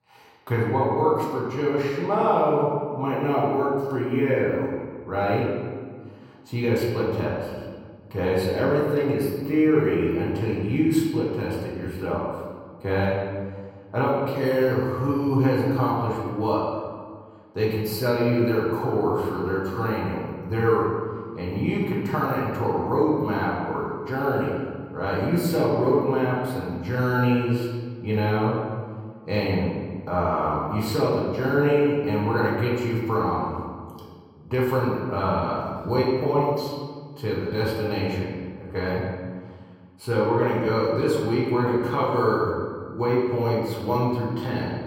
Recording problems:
off-mic speech; far
room echo; noticeable; dies away in 1.6 s

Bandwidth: 16 kHz